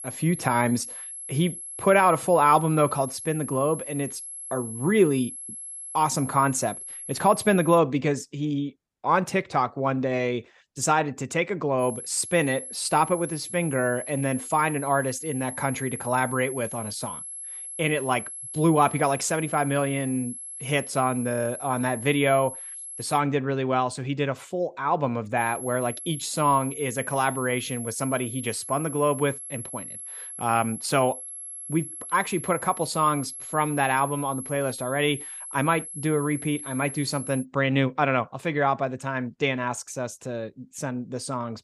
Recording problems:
high-pitched whine; loud; until 8 s, from 12 to 23 s and from 25 to 37 s; 11 kHz, 10 dB below the speech

